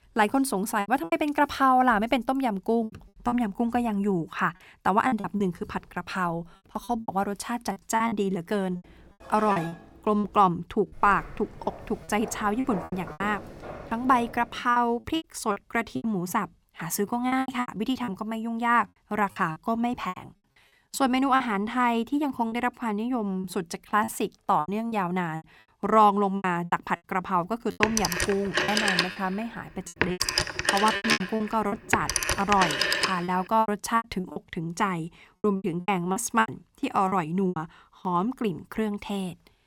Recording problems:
choppy; very; 11% of the speech affected
clattering dishes; noticeable; at 9.5 s; peak 7 dB below the speech
footsteps; faint; from 11 to 15 s; peak 10 dB below the speech
phone ringing; loud; from 28 to 33 s; peak 4 dB above the speech

